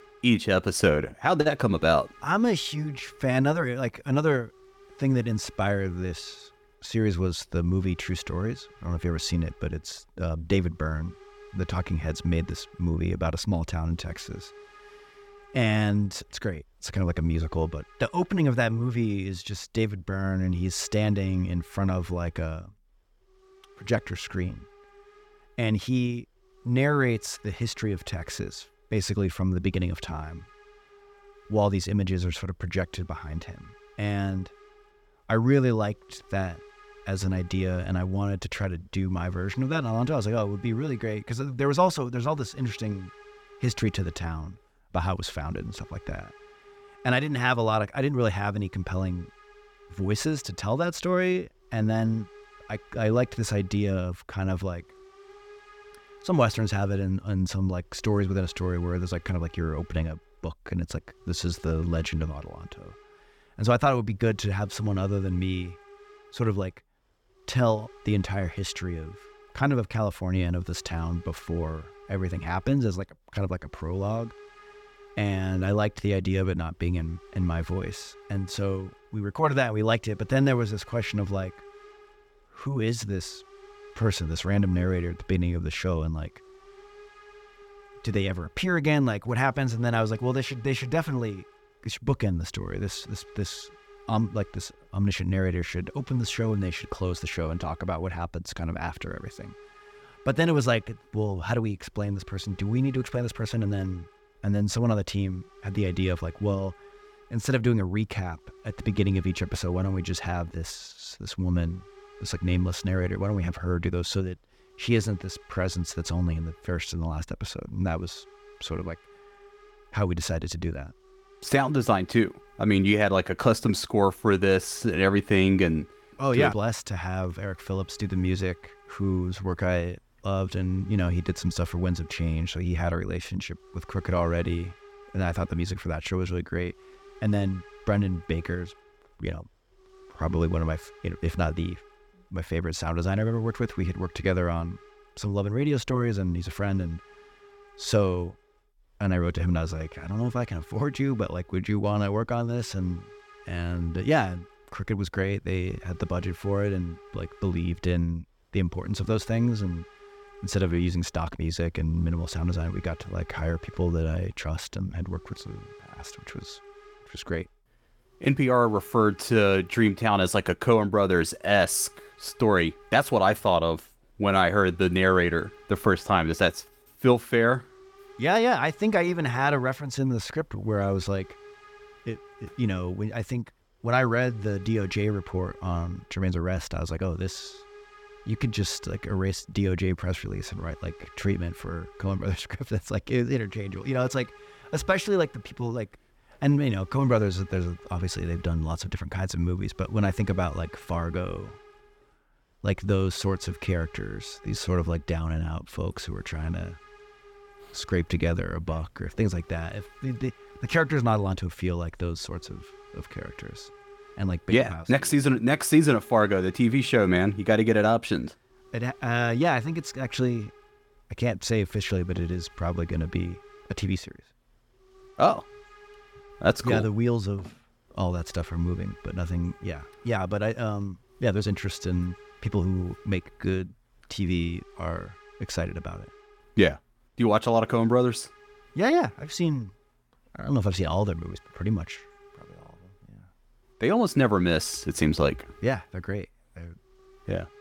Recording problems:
hiss; faint; throughout; 25 dB below the speech

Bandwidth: 17 kHz